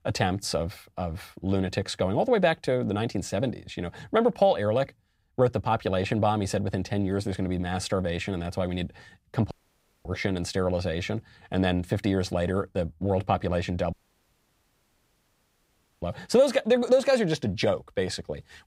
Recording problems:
audio cutting out; at 9.5 s for 0.5 s and at 14 s for 2 s

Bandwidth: 15.5 kHz